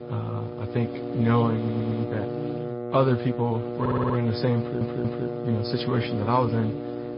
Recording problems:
garbled, watery; slightly; nothing above 5 kHz
high frequencies cut off; slight
electrical hum; loud; throughout; 60 Hz, 4 dB below the speech
audio stuttering; at 1.5 s, at 4 s and at 4.5 s

